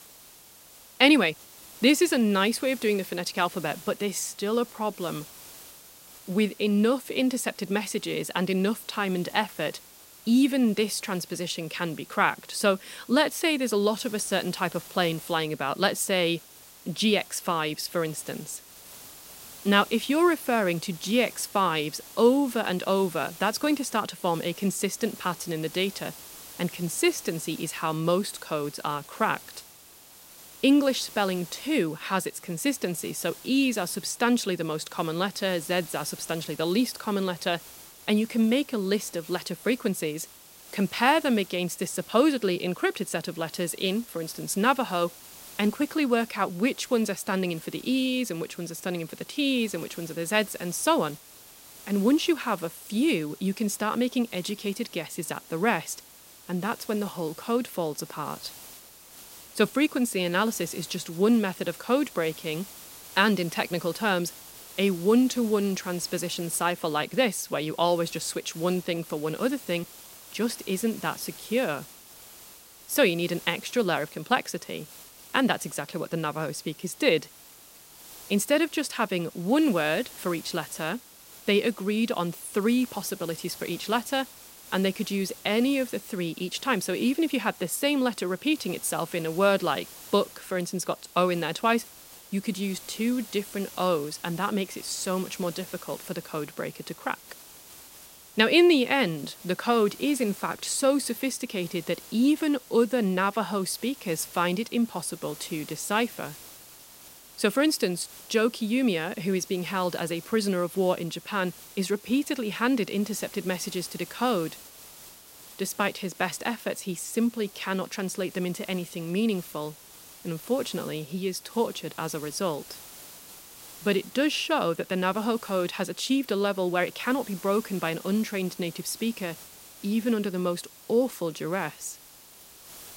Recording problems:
hiss; noticeable; throughout; 20 dB below the speech

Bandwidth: 16 kHz